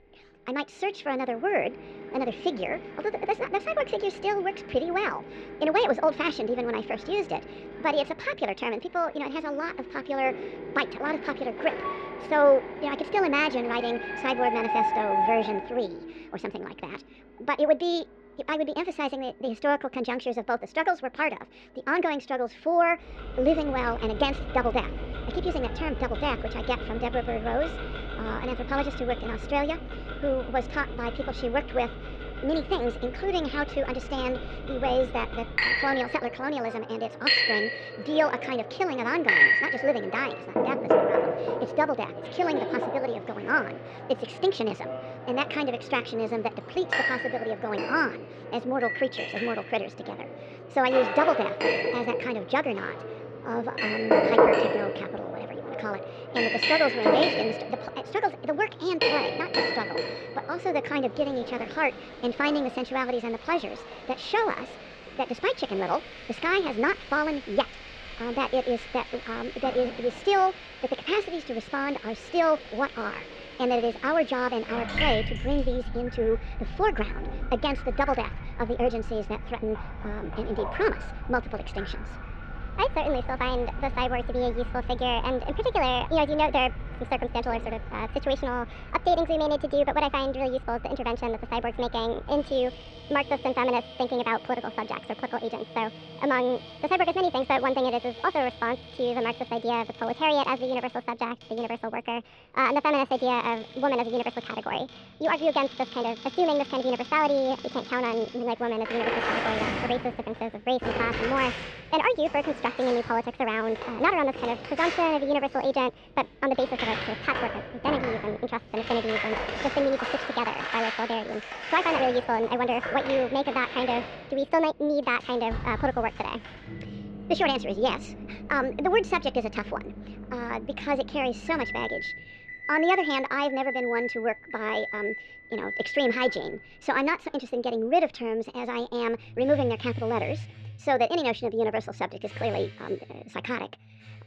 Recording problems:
muffled; very; fading above 3.5 kHz
wrong speed and pitch; too fast and too high; 1.5 times normal speed
household noises; loud; throughout; 5 dB below the speech

